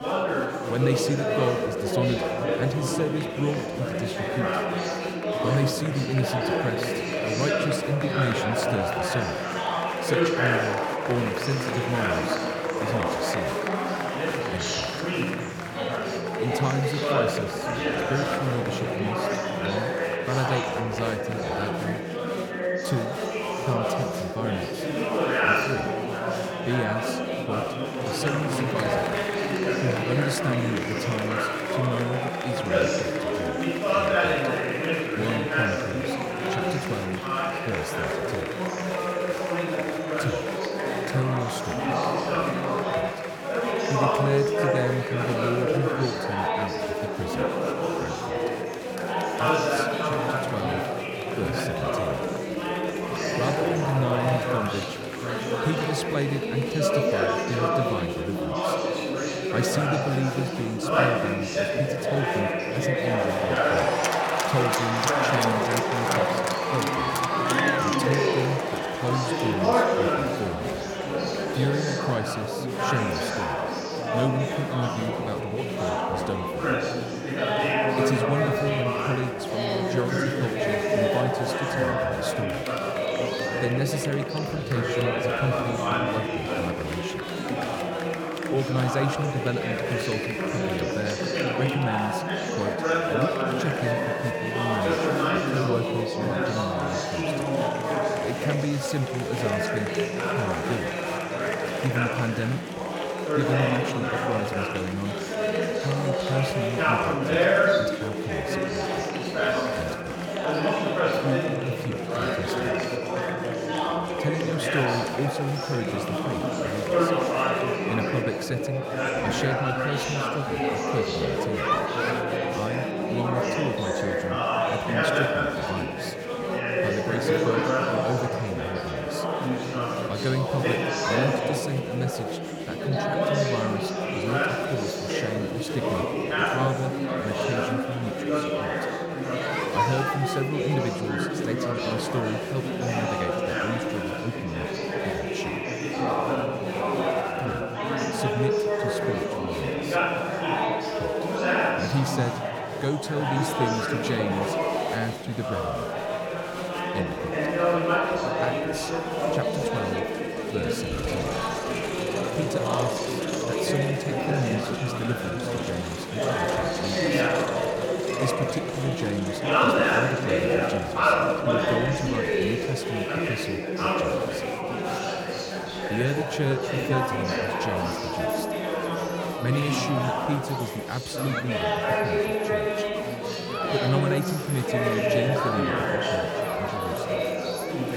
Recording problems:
chatter from many people; very loud; throughout; 5 dB above the speech

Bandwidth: 18 kHz